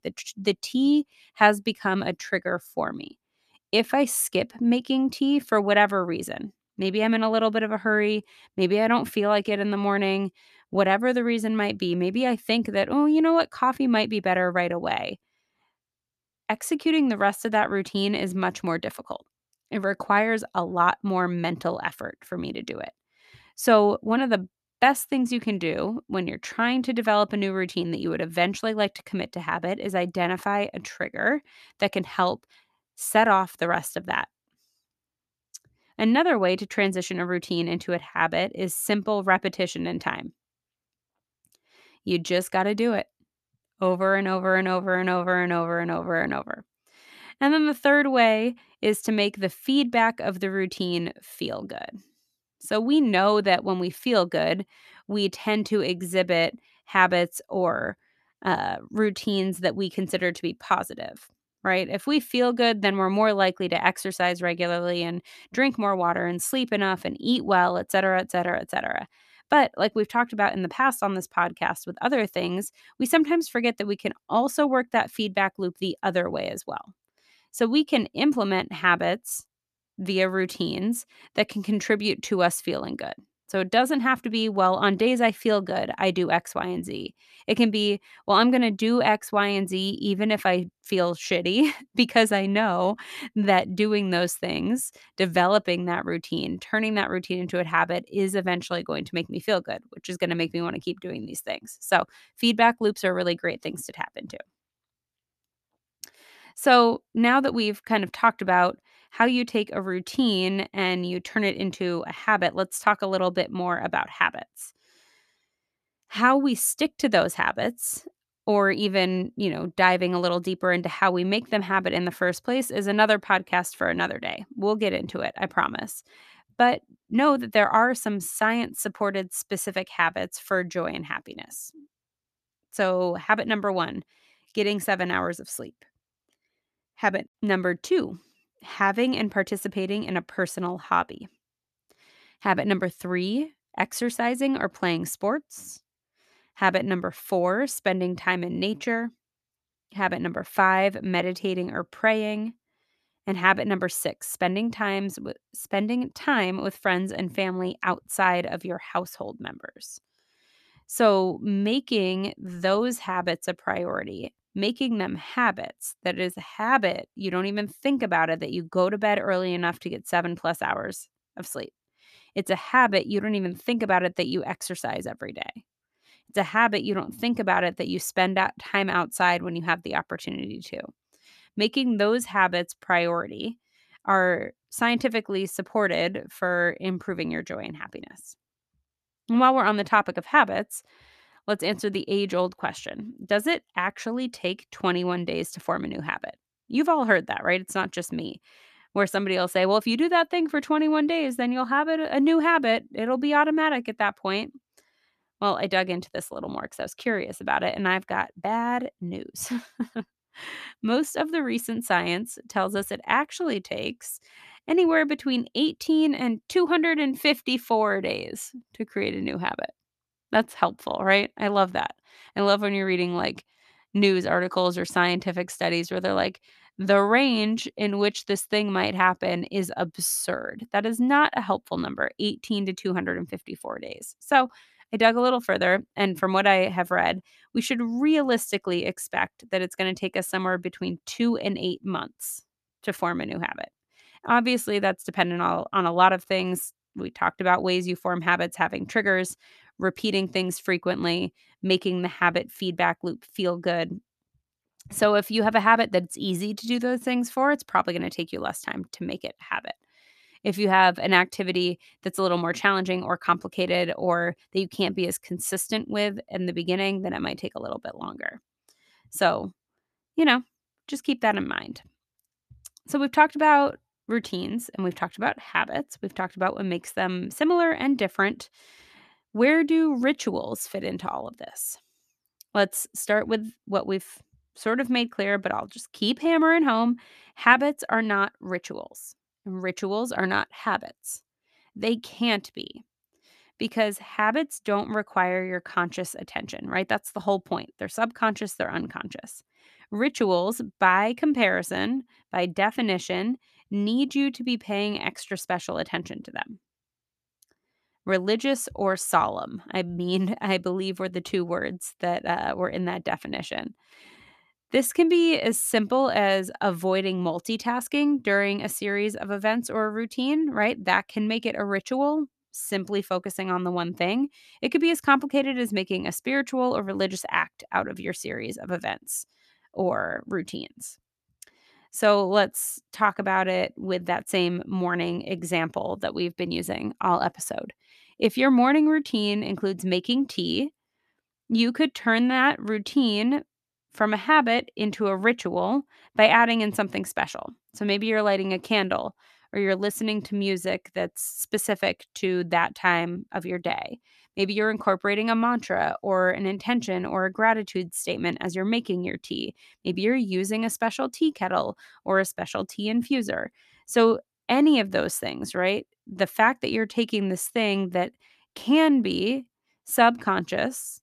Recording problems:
none

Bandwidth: 14 kHz